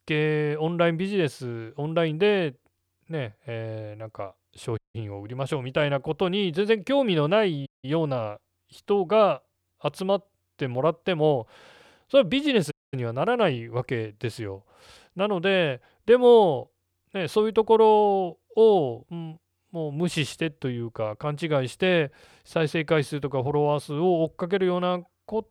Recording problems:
audio cutting out; at 5 s, at 7.5 s and at 13 s

